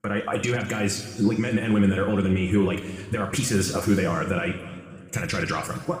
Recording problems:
wrong speed, natural pitch; too fast; 1.5 times normal speed
room echo; noticeable; dies away in 1.7 s
off-mic speech; somewhat distant

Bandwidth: 15 kHz